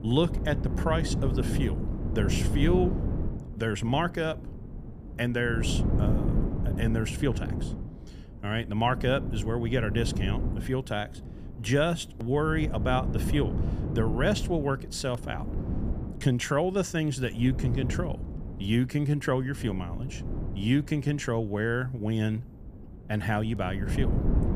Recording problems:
wind noise on the microphone; heavy; 10 dB below the speech

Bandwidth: 15 kHz